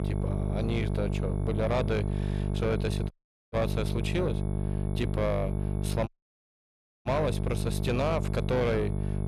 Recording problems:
distortion; slight; 10 dB below the speech
electrical hum; loud; throughout; 50 Hz, 7 dB below the speech
high-pitched whine; faint; throughout; 11 kHz, 30 dB below the speech
audio cutting out; at 3 s and at 6 s for 1 s

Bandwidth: 14 kHz